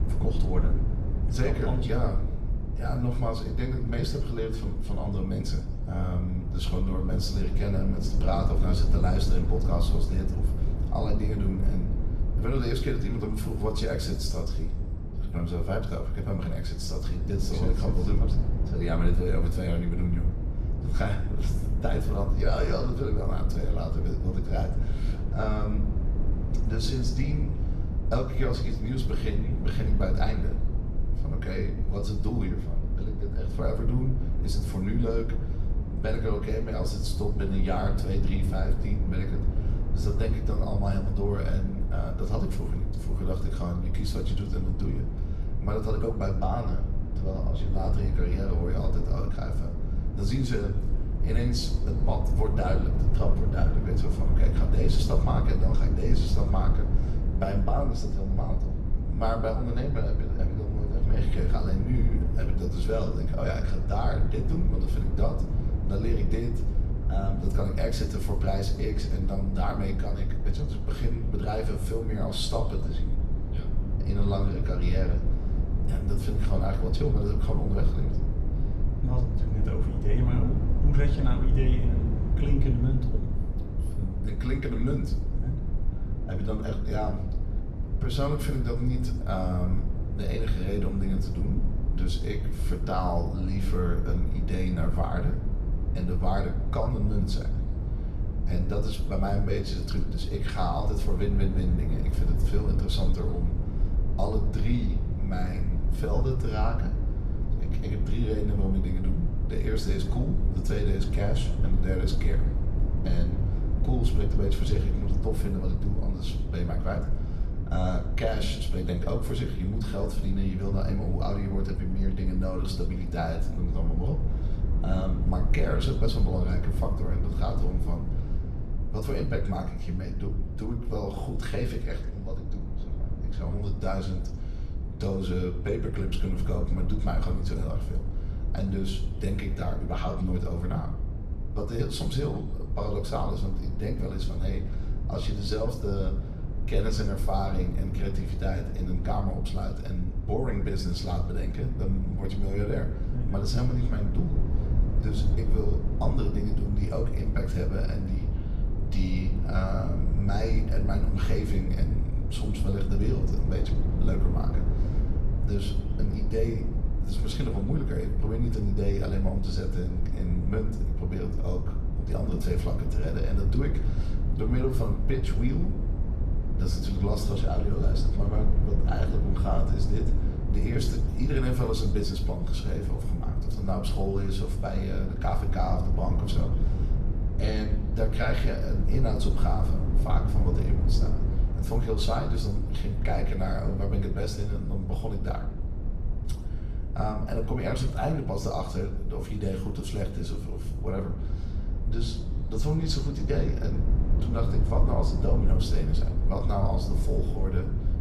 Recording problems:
off-mic speech; far
room echo; slight; dies away in 0.6 s
low rumble; loud; throughout; 7 dB below the speech

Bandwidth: 14 kHz